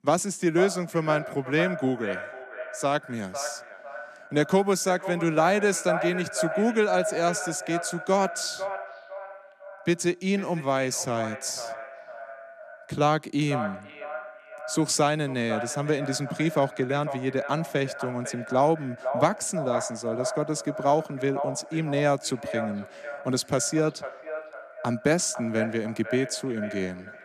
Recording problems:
echo of what is said; strong; throughout; 500 ms later, 9 dB below the speech

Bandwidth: 14 kHz